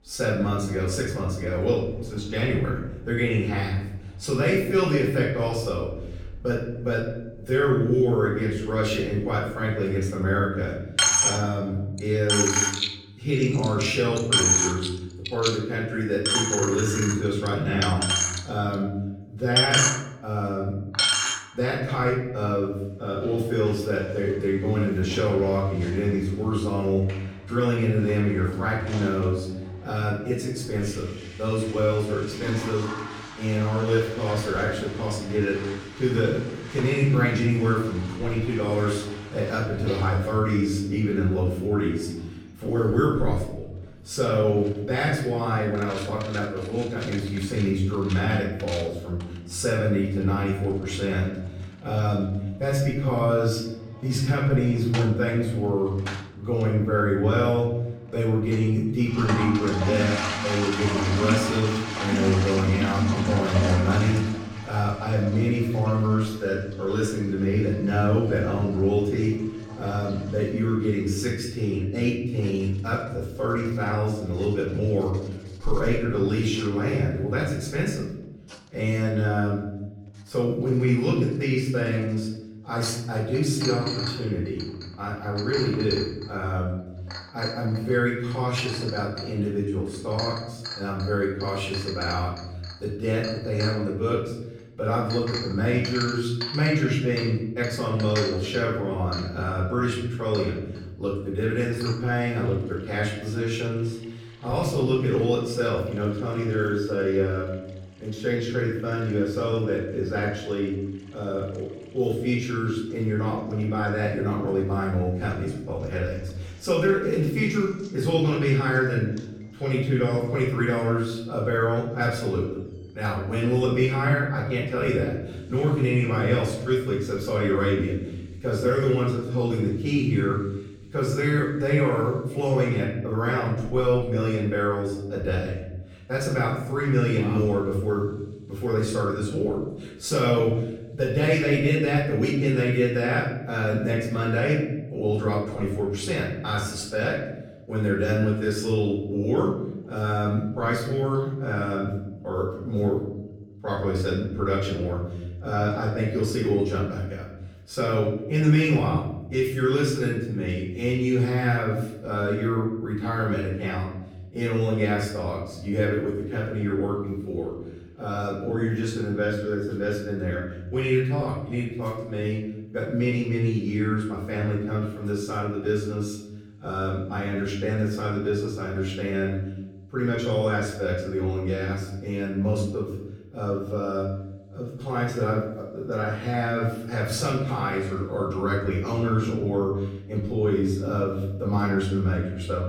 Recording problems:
off-mic speech; far
room echo; noticeable; dies away in 1 s
household noises; loud; throughout; 4 dB below the speech

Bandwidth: 17 kHz